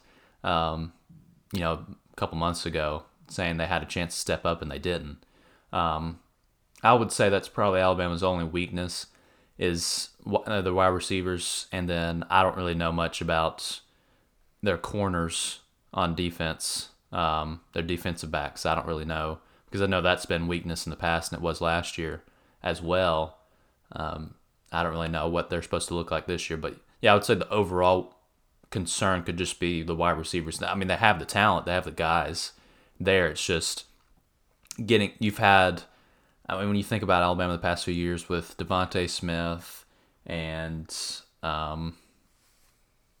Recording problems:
none

